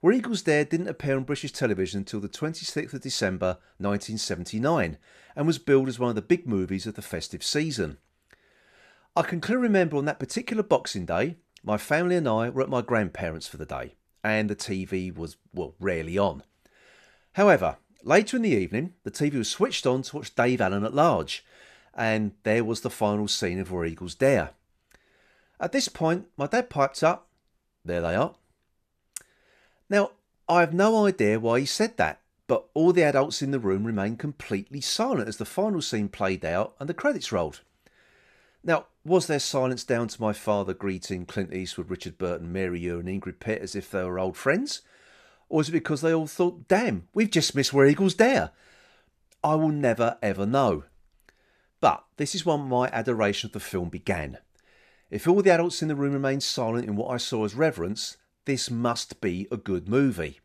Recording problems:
none

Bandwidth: 14.5 kHz